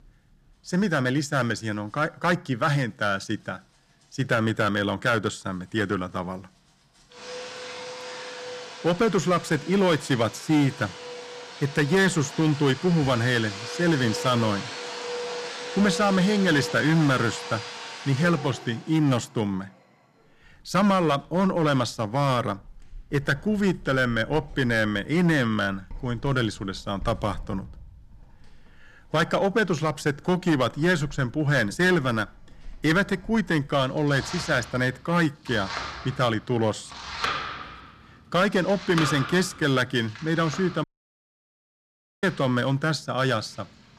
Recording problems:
distortion; slight; 4% of the sound clipped
household noises; noticeable; throughout; 10 dB below the speech
audio cutting out; at 41 s for 1.5 s

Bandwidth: 14.5 kHz